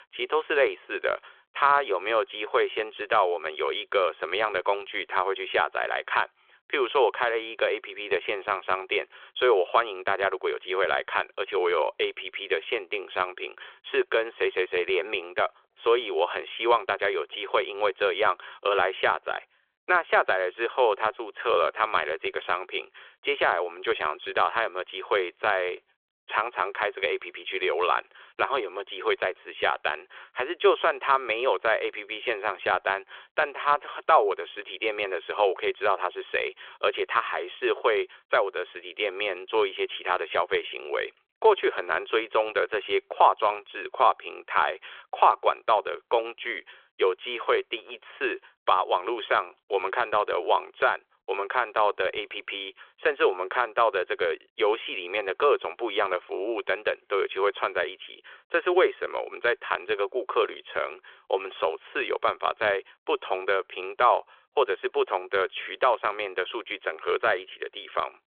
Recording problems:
phone-call audio; nothing above 3.5 kHz

